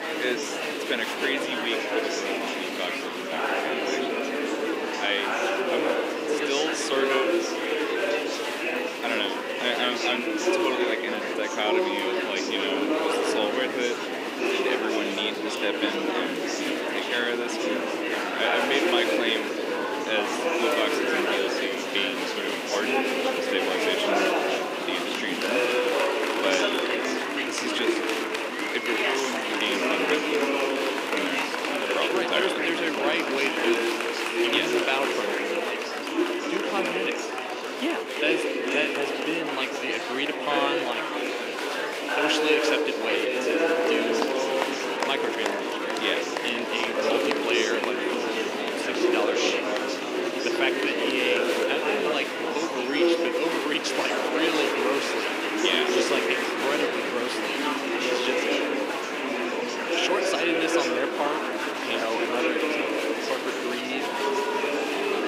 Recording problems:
thin; somewhat; fading below 300 Hz
murmuring crowd; very loud; throughout; 3 dB above the speech
wind noise on the microphone; heavy; until 34 s and from 43 s on; 9 dB below the speech

